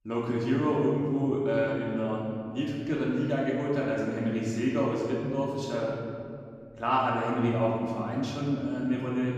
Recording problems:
off-mic speech; far
room echo; noticeable; dies away in 2 s

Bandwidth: 14.5 kHz